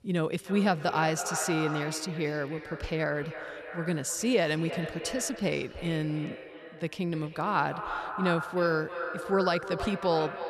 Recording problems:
echo of what is said; strong; throughout; 310 ms later, 8 dB below the speech

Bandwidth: 13.5 kHz